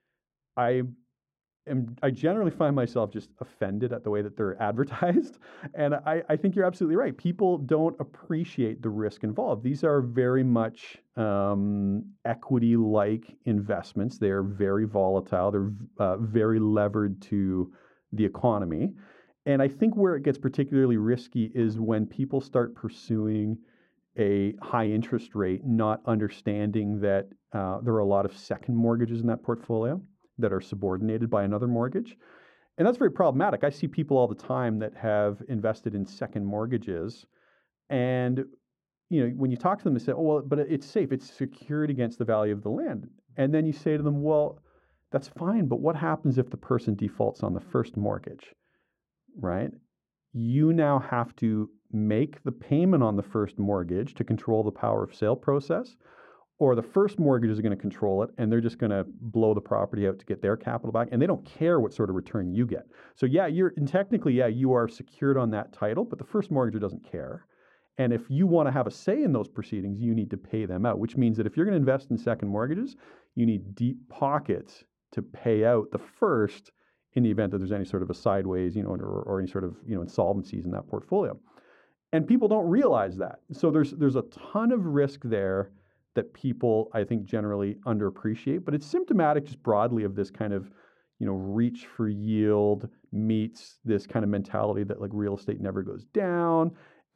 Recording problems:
muffled; very; fading above 2 kHz

